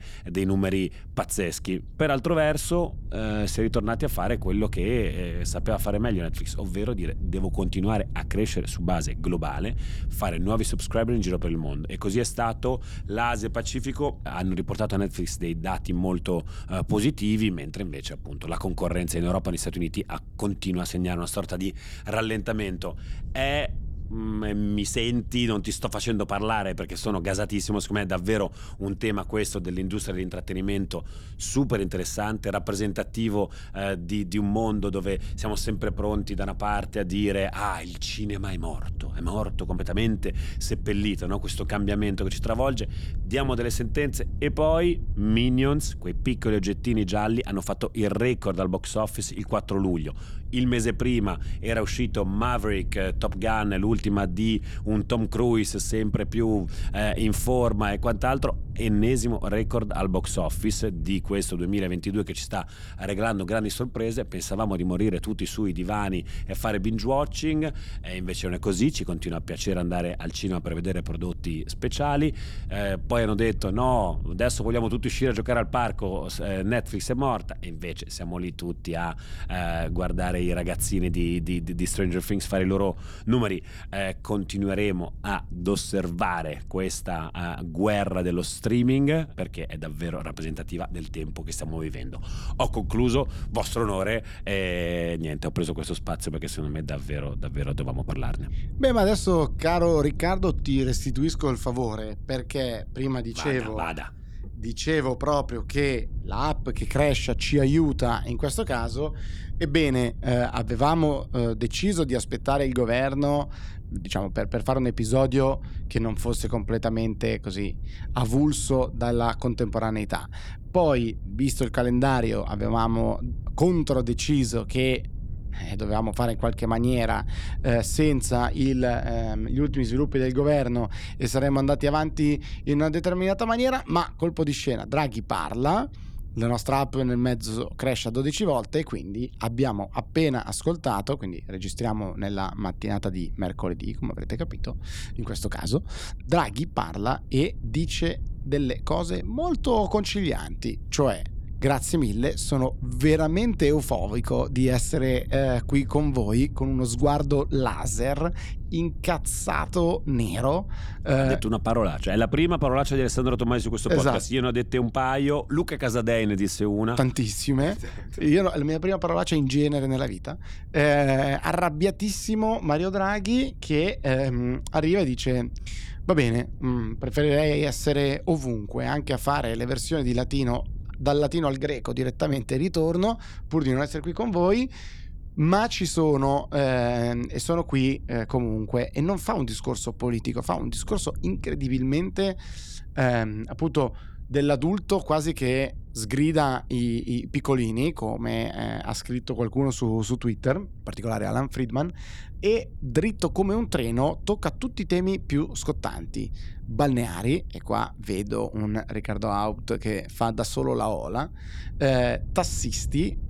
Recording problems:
wind noise on the microphone; occasional gusts; 25 dB below the speech

